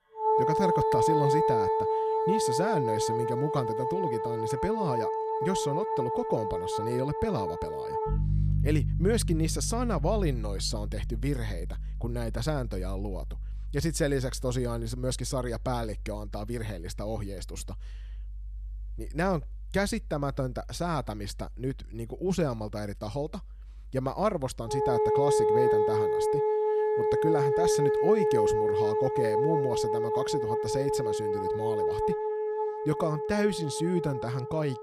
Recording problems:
background music; very loud; throughout; 3 dB above the speech

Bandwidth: 14.5 kHz